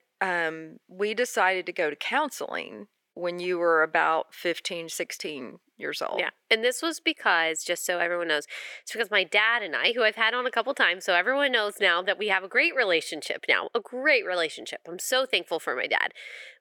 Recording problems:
thin; somewhat; fading below 450 Hz

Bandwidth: 17.5 kHz